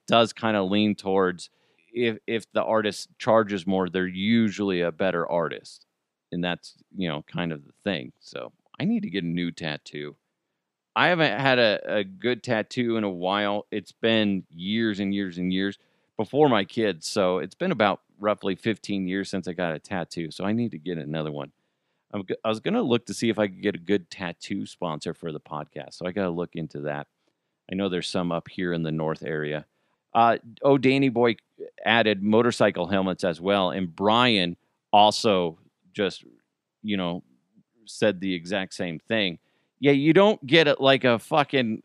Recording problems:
none

